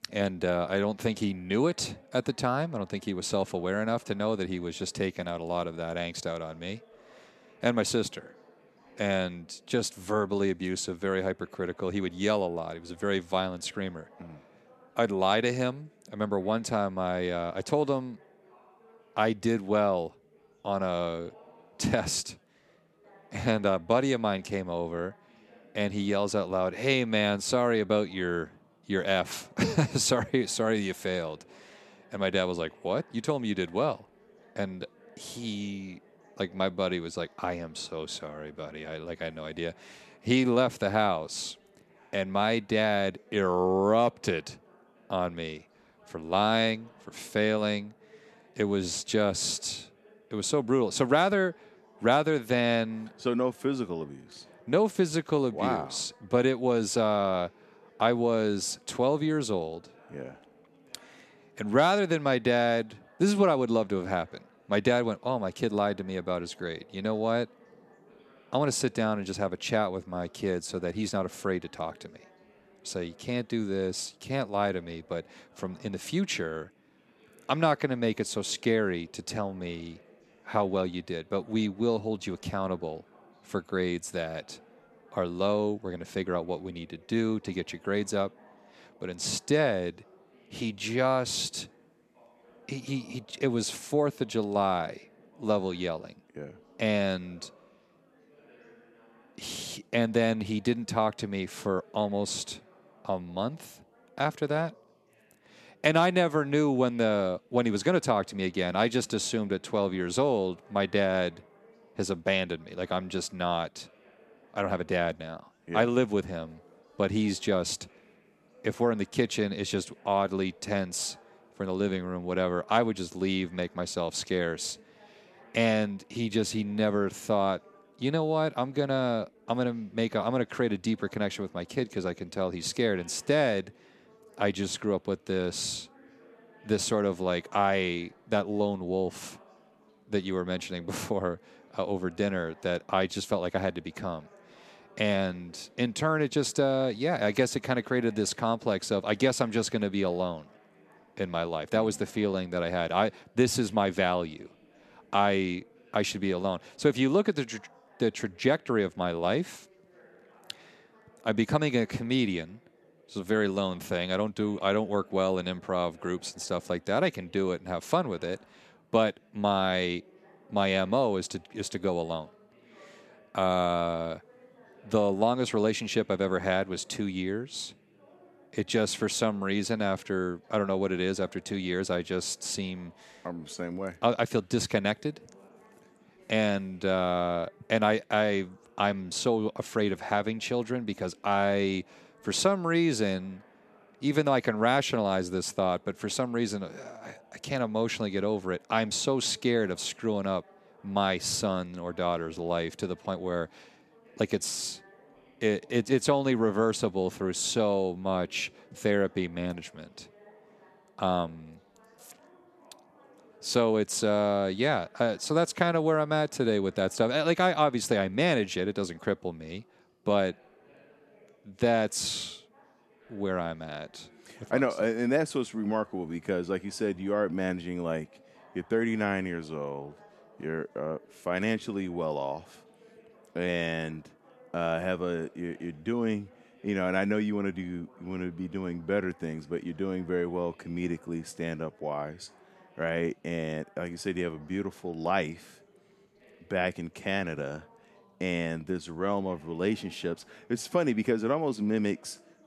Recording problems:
chatter from many people; faint; throughout; 30 dB below the speech

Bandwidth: 13.5 kHz